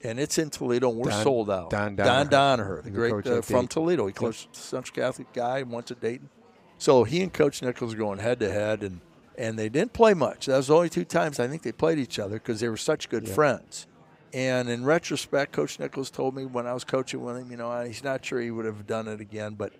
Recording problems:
murmuring crowd; faint; throughout; 30 dB below the speech

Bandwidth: 15.5 kHz